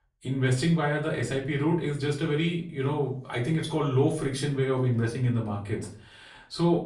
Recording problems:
off-mic speech; far
room echo; slight; dies away in 0.4 s

